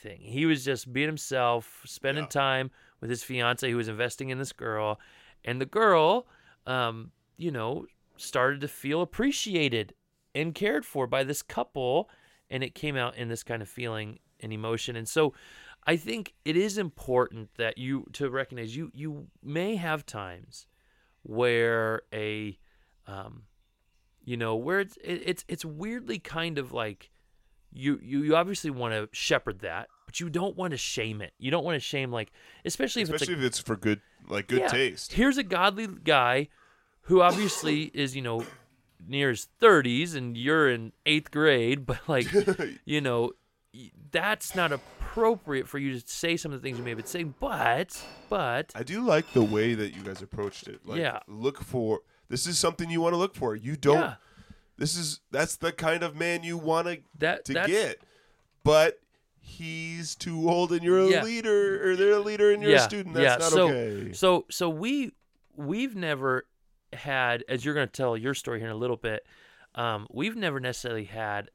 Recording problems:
household noises; faint; until 51 s; 25 dB below the speech

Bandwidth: 16.5 kHz